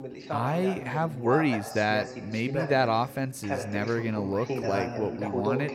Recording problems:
voice in the background; loud; throughout; 6 dB below the speech

